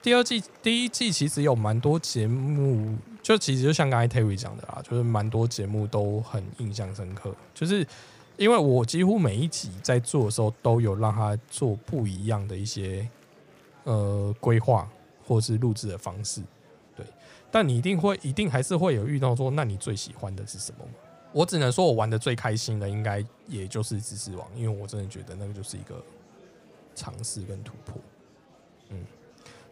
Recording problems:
murmuring crowd; faint; throughout; 30 dB below the speech

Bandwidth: 15 kHz